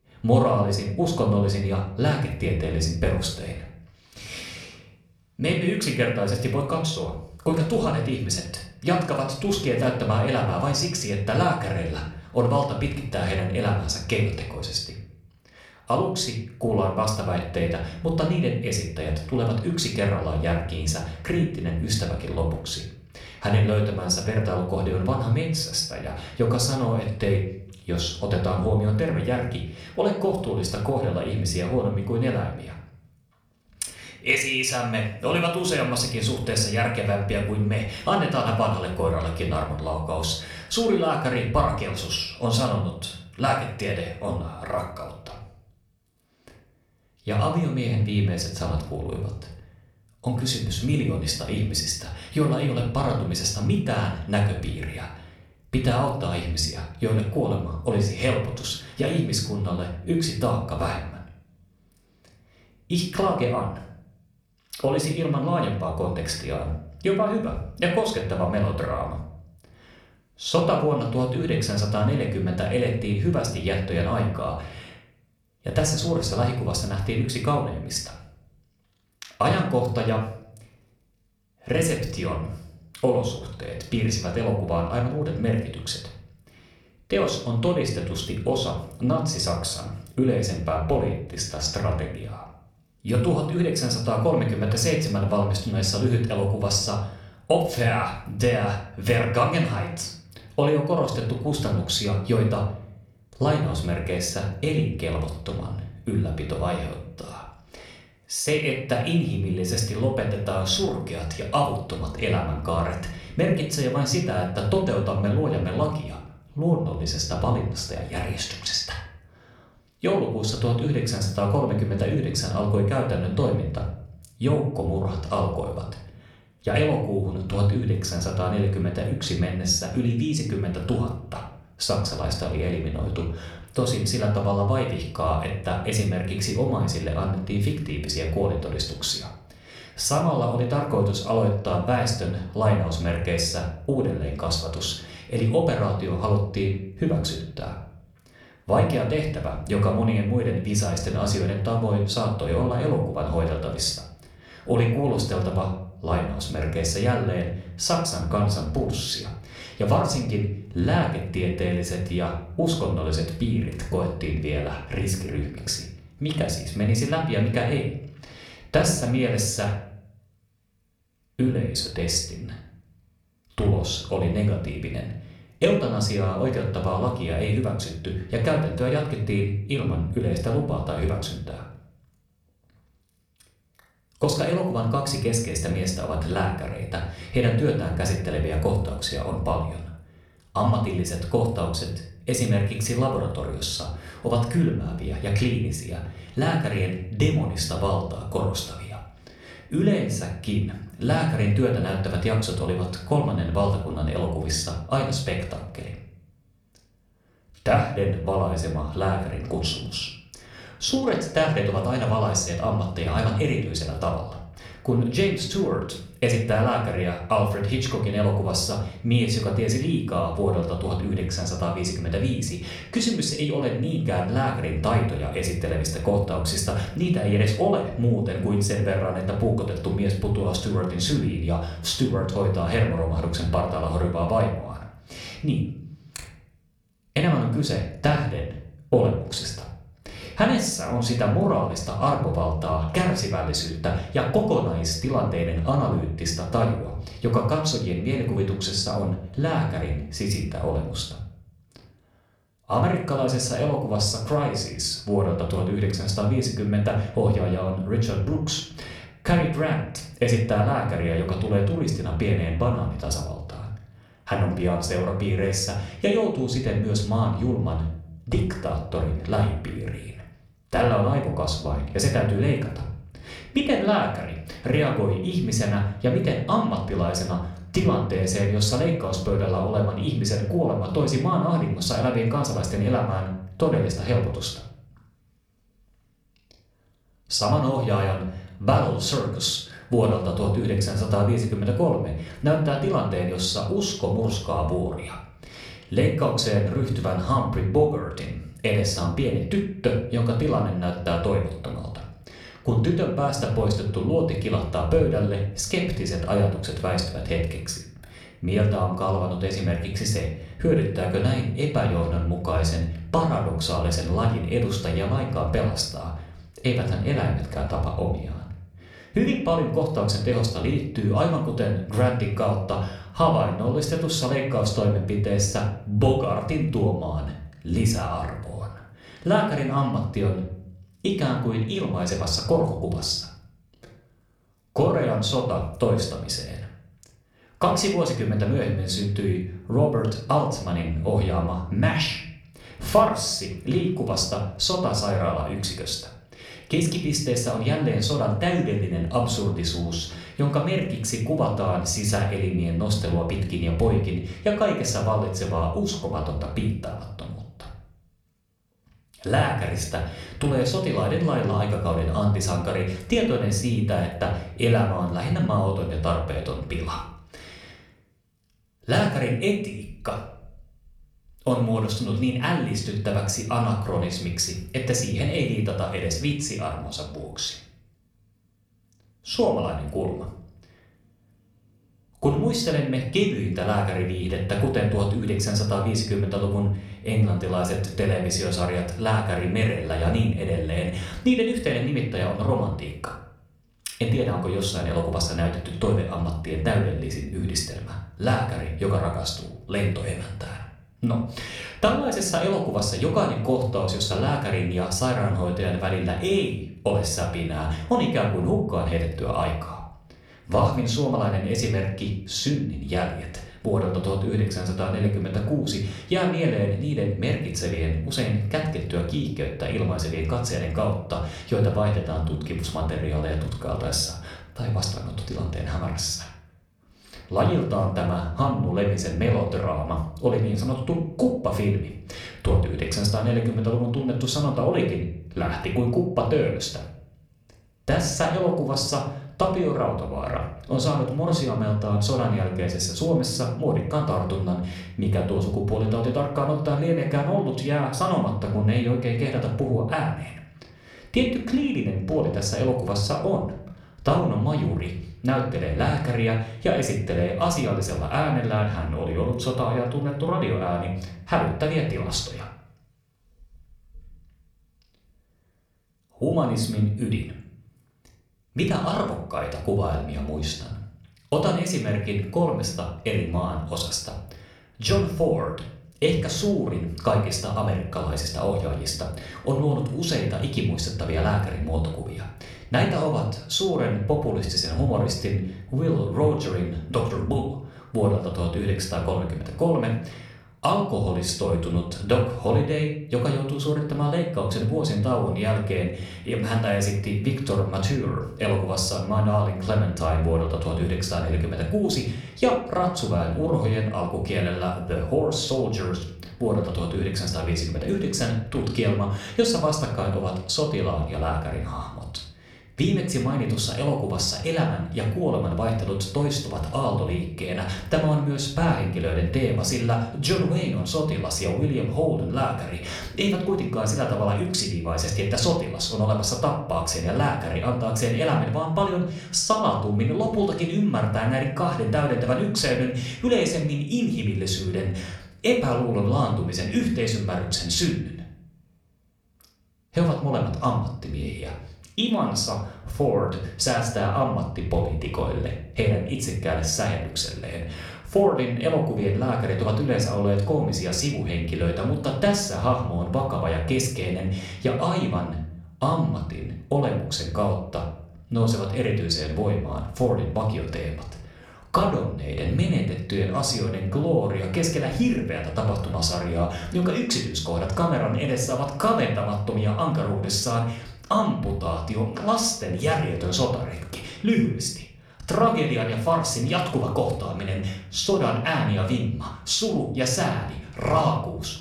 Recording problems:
room echo; slight; dies away in 0.5 s
off-mic speech; somewhat distant

